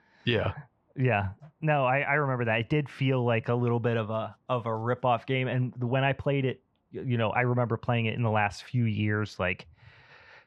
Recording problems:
muffled; very; fading above 2.5 kHz

